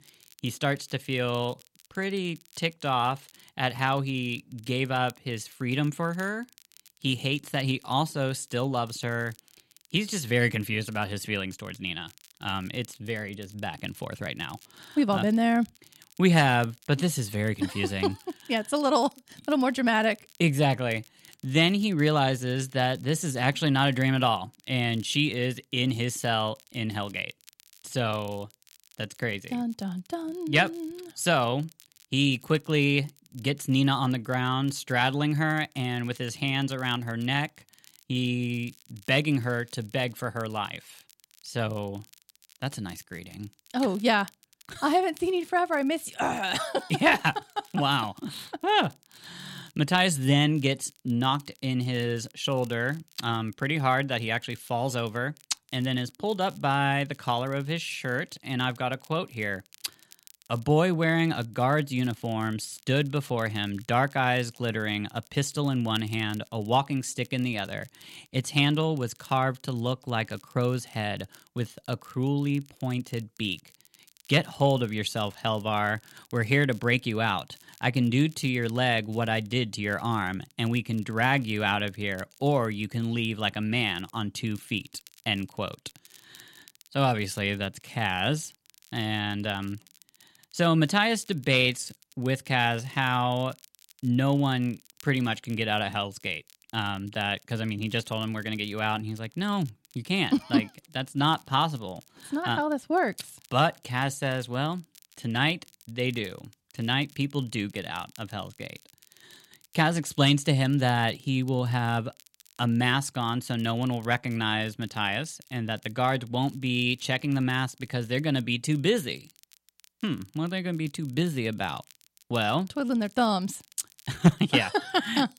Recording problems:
crackle, like an old record; faint; 25 dB below the speech

